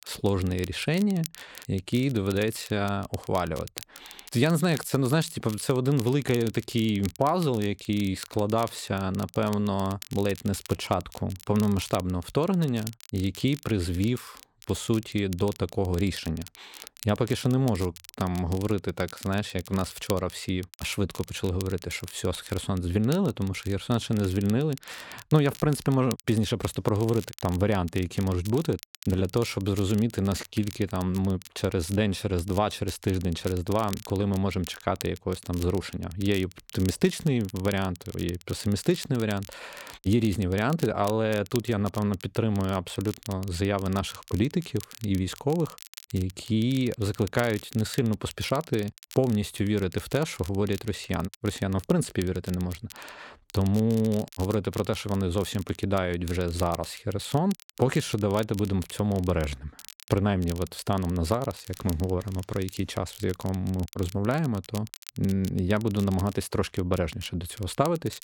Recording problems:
crackle, like an old record; noticeable; 15 dB below the speech

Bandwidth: 17 kHz